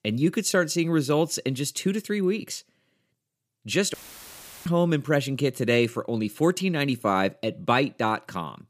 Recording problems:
audio cutting out; filled with static; at 4 s for 0.5 s

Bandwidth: 15 kHz